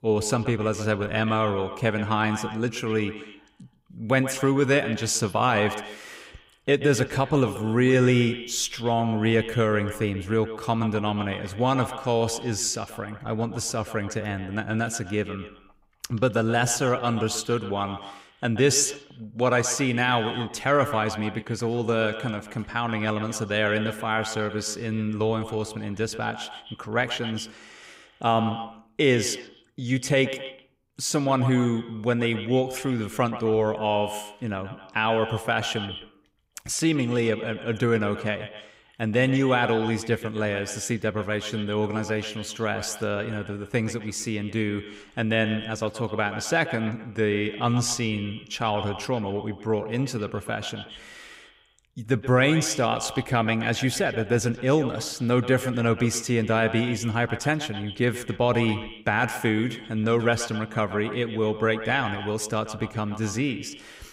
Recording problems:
echo of what is said; strong; throughout; 130 ms later, 10 dB below the speech

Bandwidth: 15.5 kHz